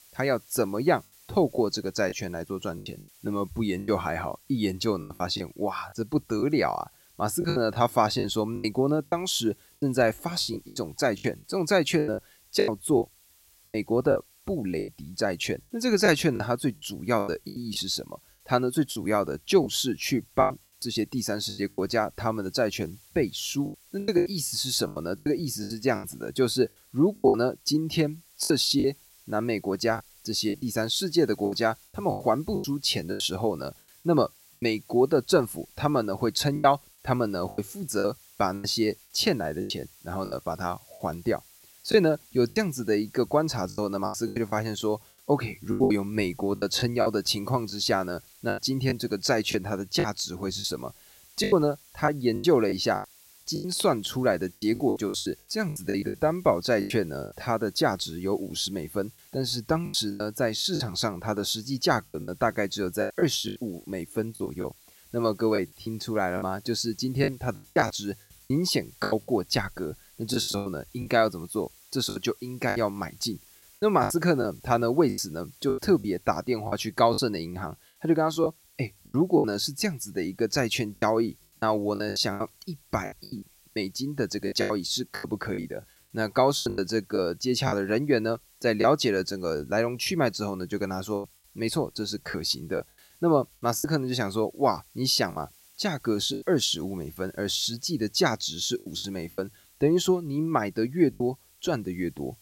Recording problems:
hiss; faint; throughout; 25 dB below the speech
choppy; very; 11% of the speech affected

